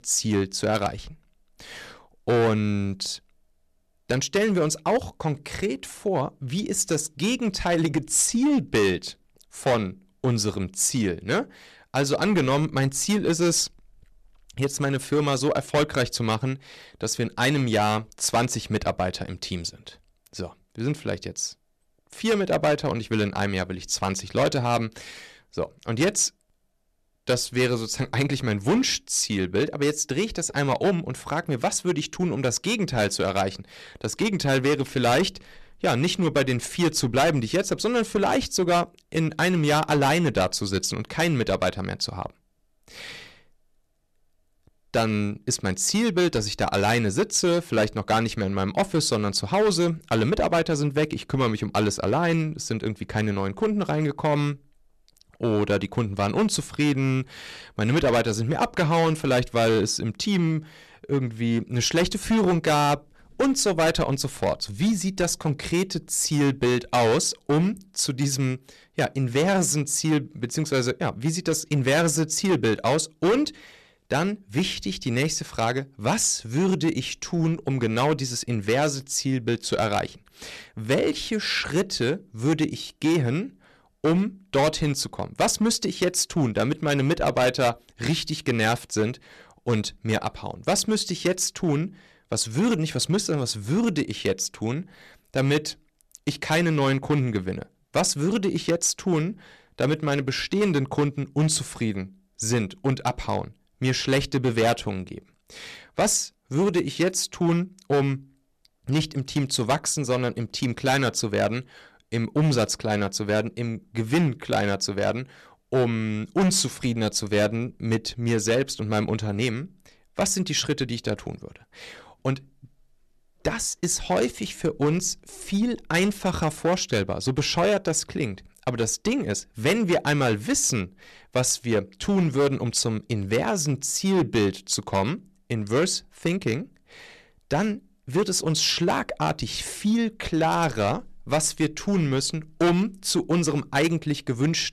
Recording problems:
distortion; heavy; 7% of the sound clipped

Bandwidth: 13.5 kHz